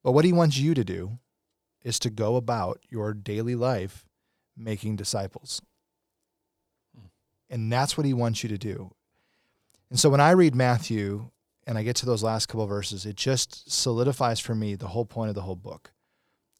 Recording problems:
none

